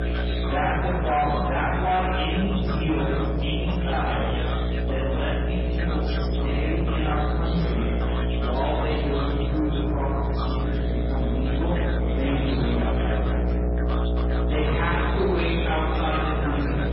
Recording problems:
room echo; strong; dies away in 1.3 s
off-mic speech; far
garbled, watery; badly; nothing above 5 kHz
distortion; slight; 10 dB below the speech
electrical hum; loud; throughout; 60 Hz, 5 dB below the speech
background chatter; loud; throughout; 4 voices, 7 dB below the speech

